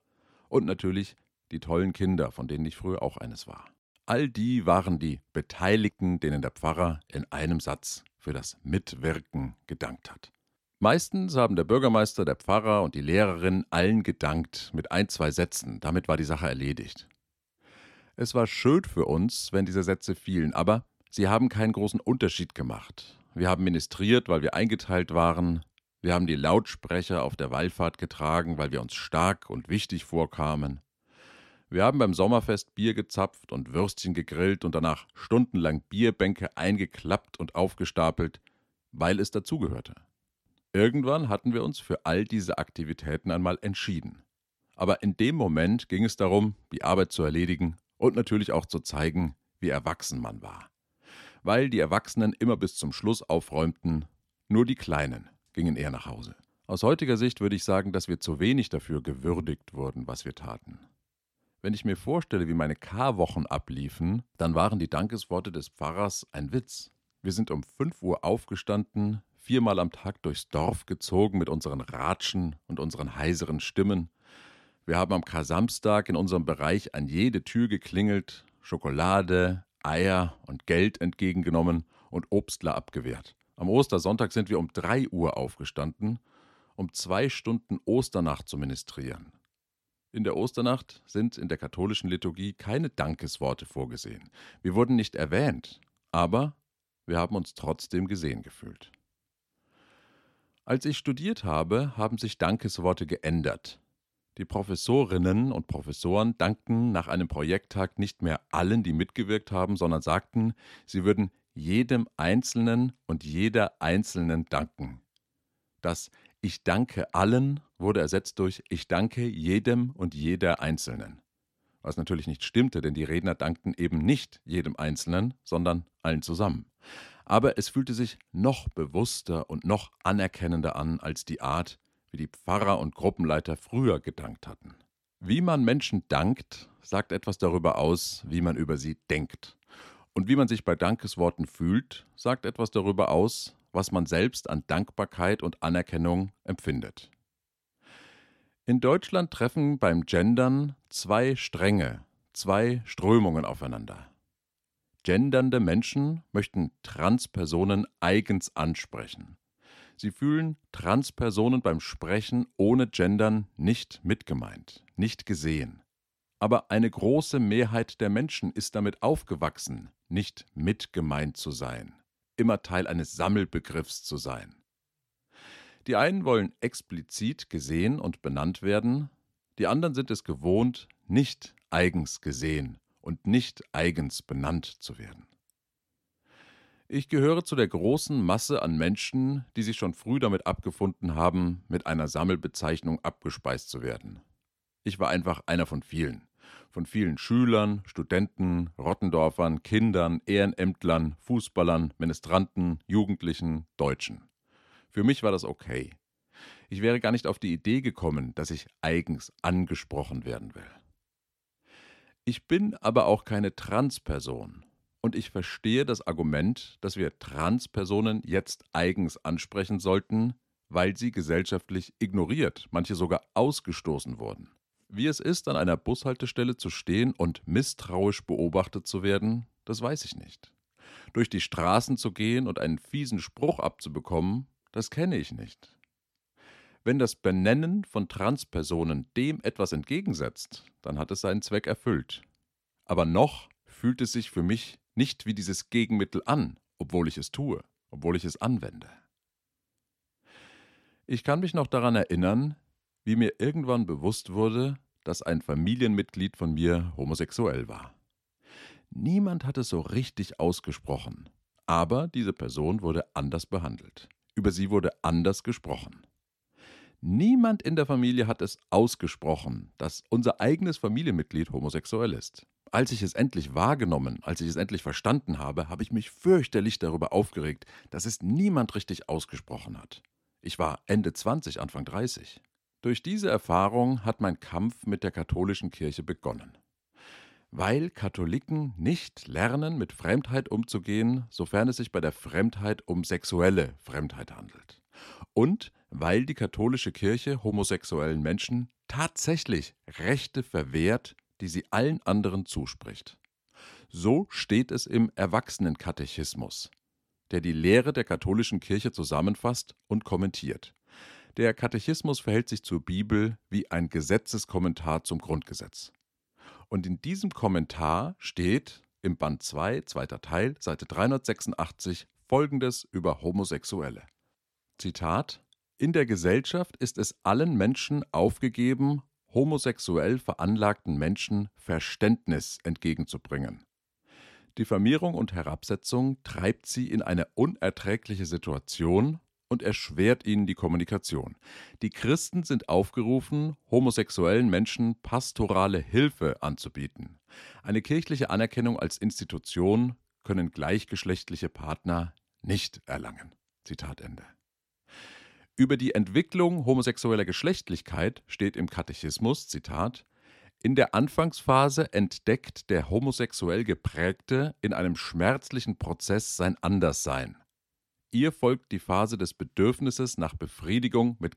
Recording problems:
none

